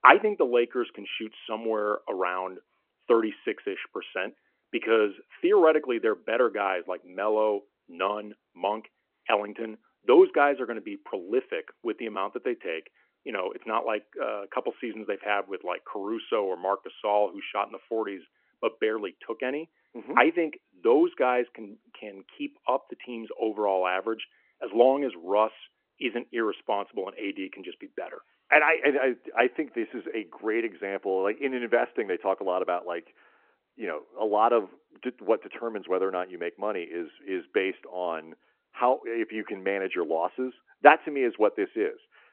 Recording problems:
phone-call audio

